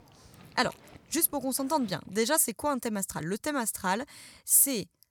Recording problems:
animal sounds; faint; until 2 s; 25 dB below the speech

